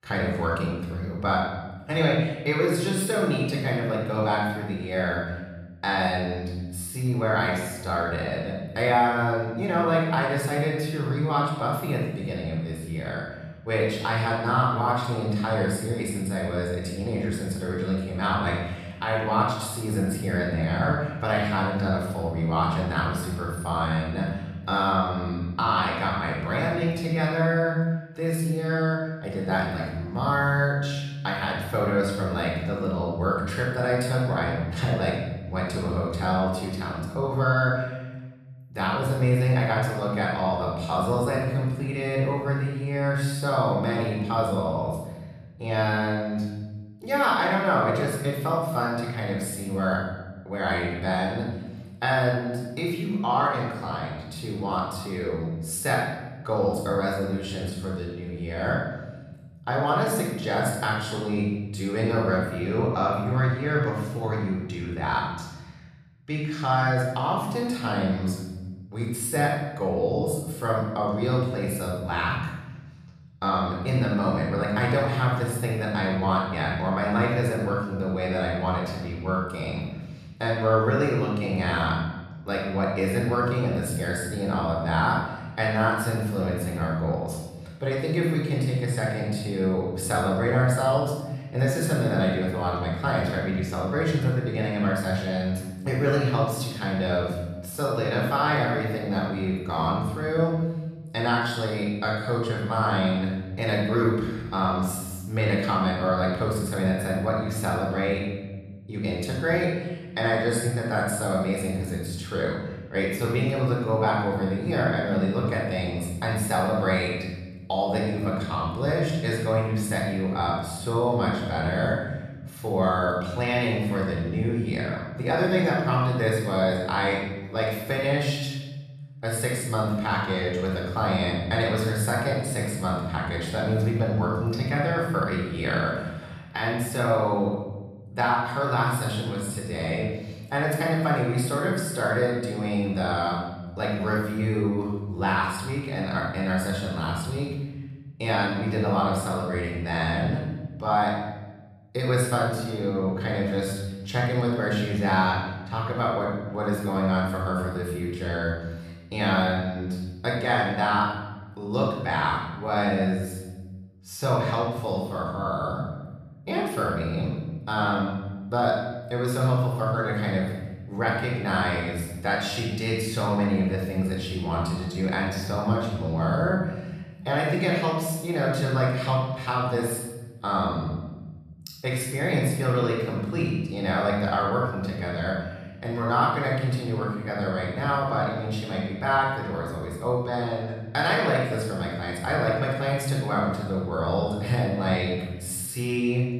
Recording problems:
off-mic speech; far
room echo; noticeable; dies away in 1.2 s

